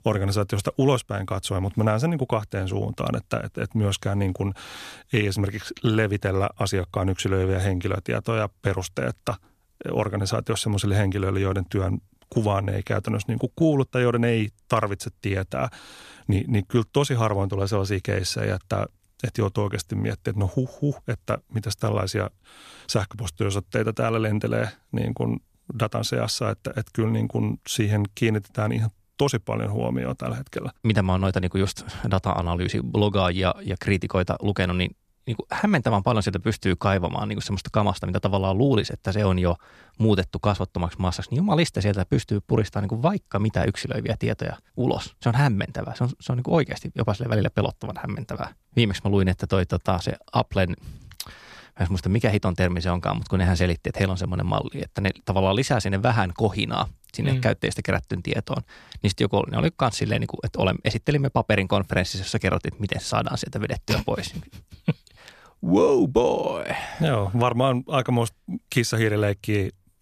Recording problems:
none

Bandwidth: 14.5 kHz